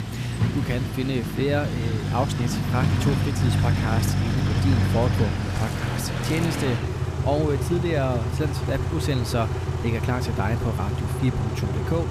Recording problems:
traffic noise; very loud; throughout; 2 dB above the speech
rain or running water; noticeable; throughout; 15 dB below the speech

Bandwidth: 14.5 kHz